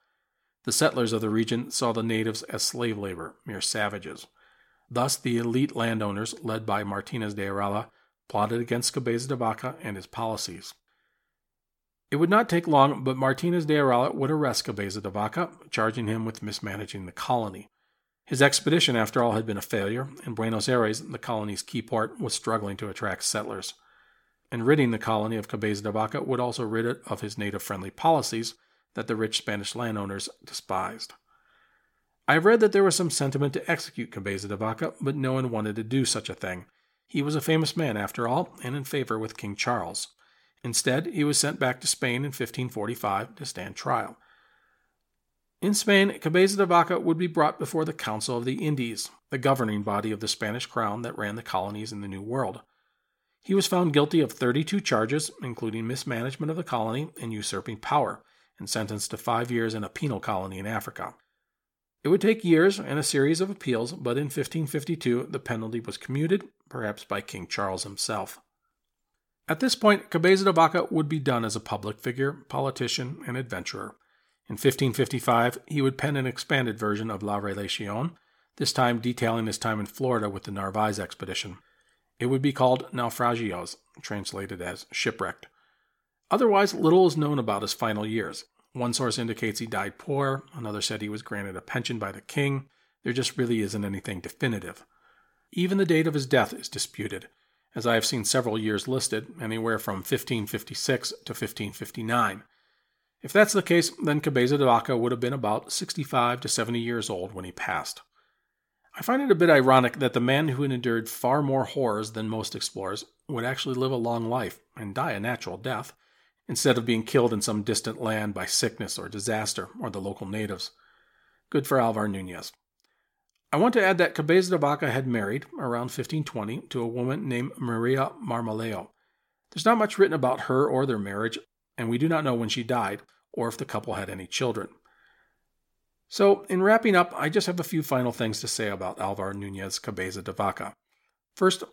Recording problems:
none

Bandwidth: 17 kHz